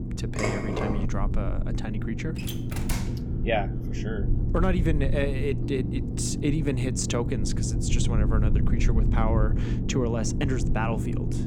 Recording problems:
low rumble; loud; throughout; 6 dB below the speech
clattering dishes; loud; at 0.5 s; peak 1 dB above the speech
door banging; noticeable; at 2.5 s; peak 4 dB below the speech
phone ringing; noticeable; at 5.5 s; peak 8 dB below the speech

